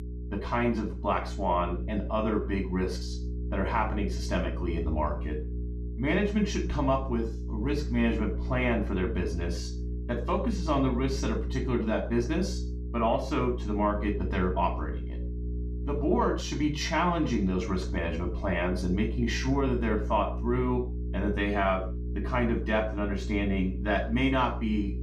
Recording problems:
off-mic speech; far
room echo; slight; dies away in 0.3 s
electrical hum; noticeable; throughout; 60 Hz, 15 dB below the speech

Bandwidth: 14.5 kHz